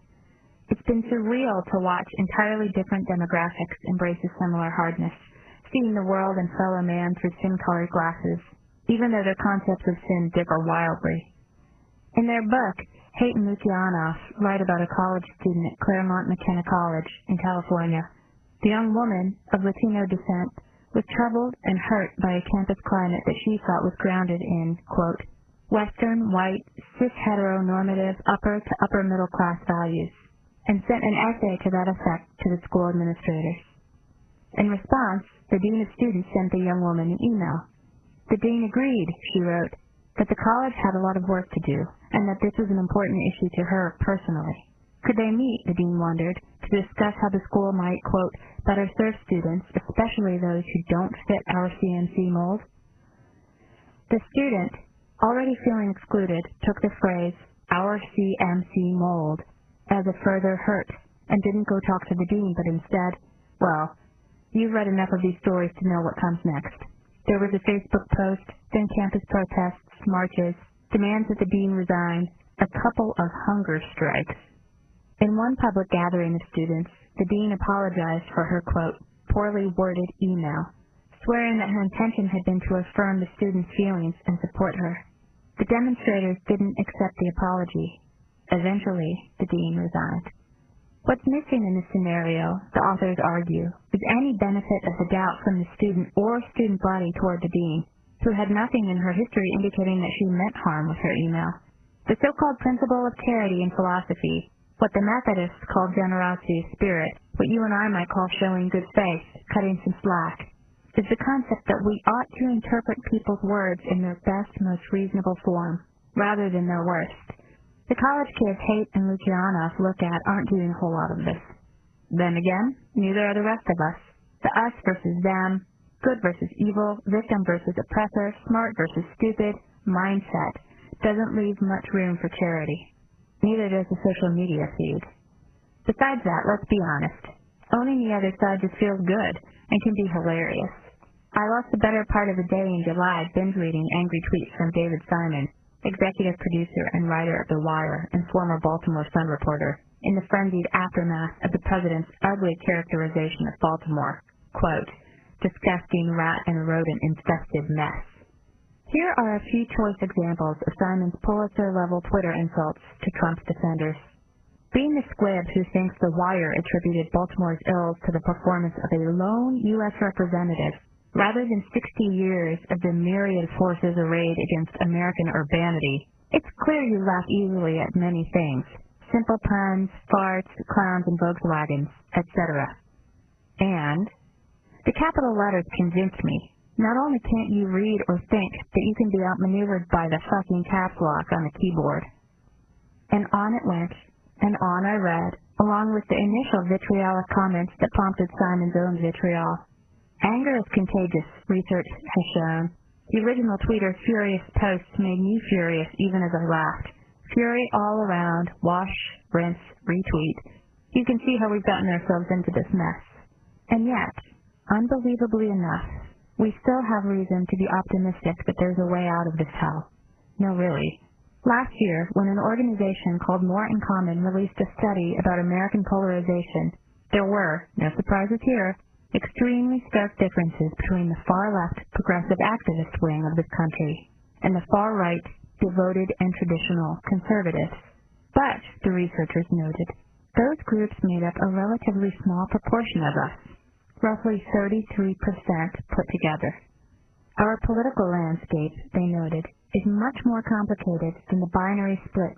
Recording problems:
garbled, watery; badly; nothing above 3 kHz
squashed, flat; heavily

